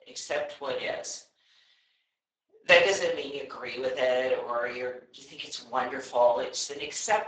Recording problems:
garbled, watery; badly; nothing above 7.5 kHz
thin; somewhat; fading below 350 Hz
room echo; slight; dies away in 0.4 s
off-mic speech; somewhat distant

